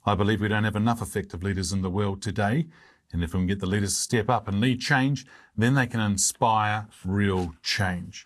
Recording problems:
garbled, watery; slightly

